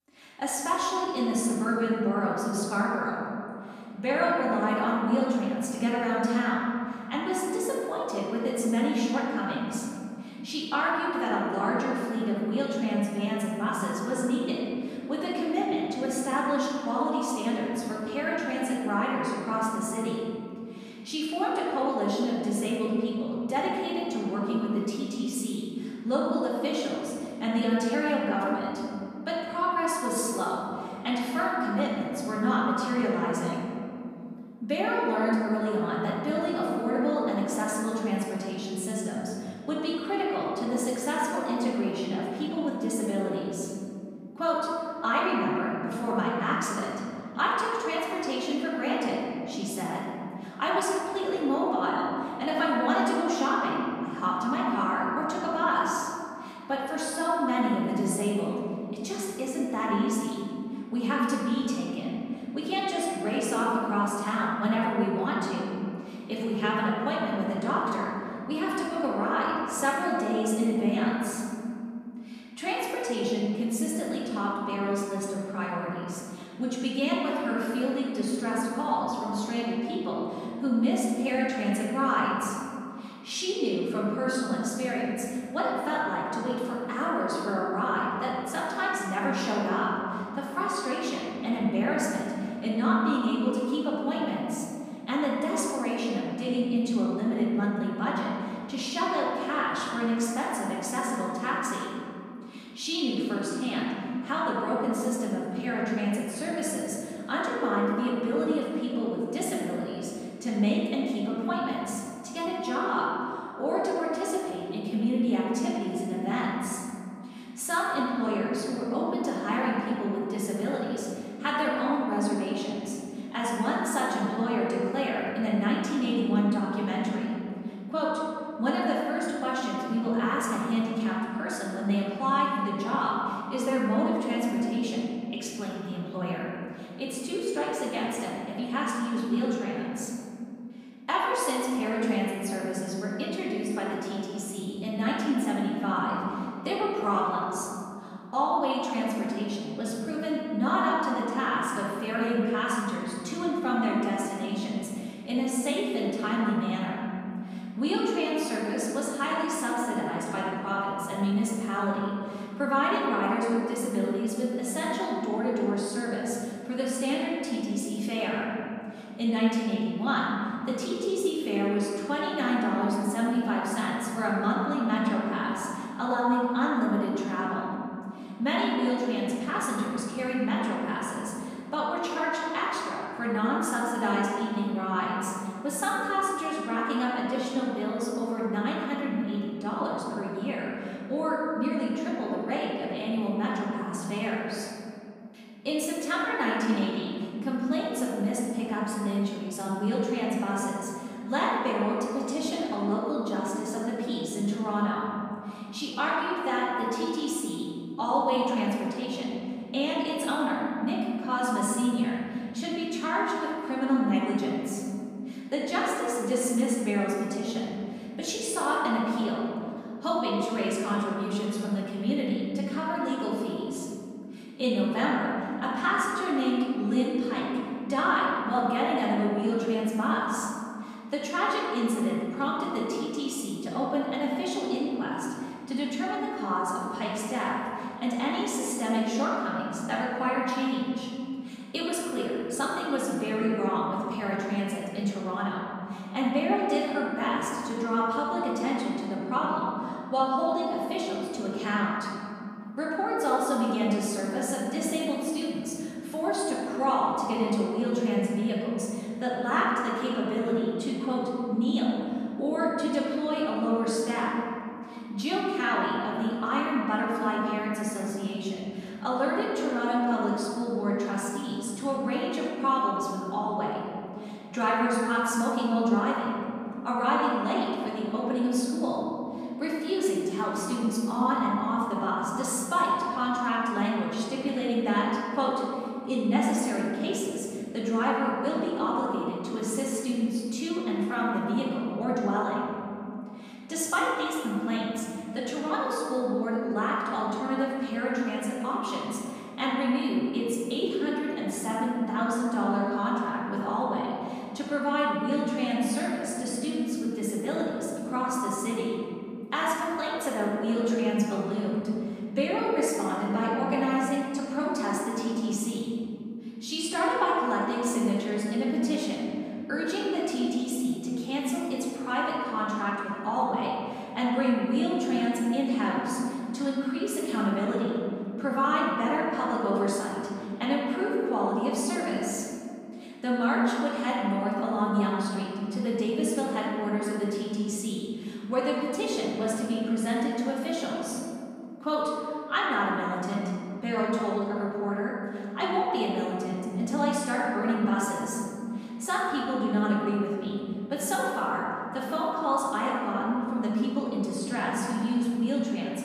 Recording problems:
room echo; strong; dies away in 2.6 s
off-mic speech; far

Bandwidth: 15 kHz